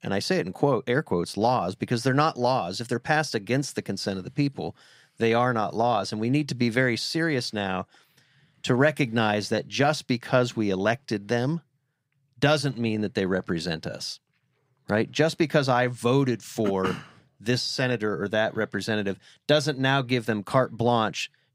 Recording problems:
none

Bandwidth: 15.5 kHz